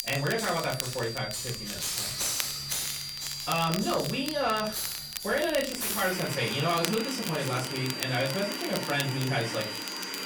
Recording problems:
off-mic speech; far
distortion; slight; 10 dB below the speech
room echo; very slight; dies away in 0.3 s
high-pitched whine; loud; throughout; 4.5 kHz, 8 dB below the speech
household noises; loud; throughout; 5 dB below the speech
crackle, like an old record; loud; 9 dB below the speech

